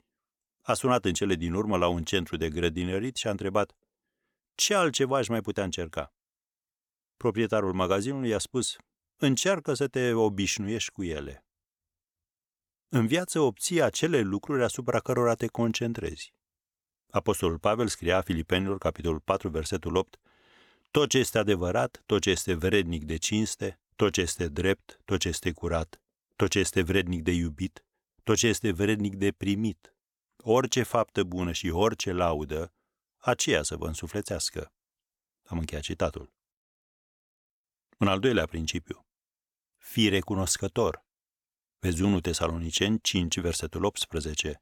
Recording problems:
none

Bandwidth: 18.5 kHz